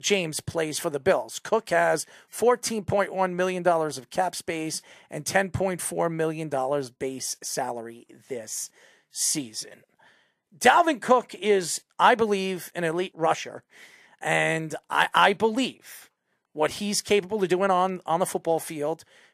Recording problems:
none

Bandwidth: 14.5 kHz